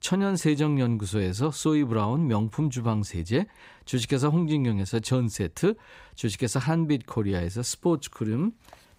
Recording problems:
none

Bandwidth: 15.5 kHz